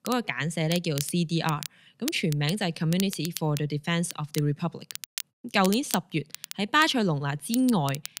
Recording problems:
crackle, like an old record; noticeable; 10 dB below the speech

